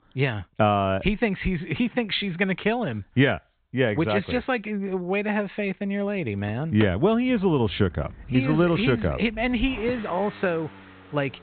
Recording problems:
high frequencies cut off; severe; nothing above 4 kHz
traffic noise; noticeable; from 7 s on; 15 dB below the speech

